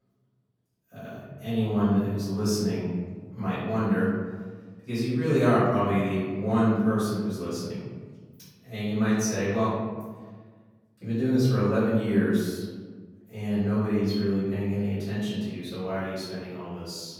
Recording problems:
room echo; strong; dies away in 1.4 s
off-mic speech; far

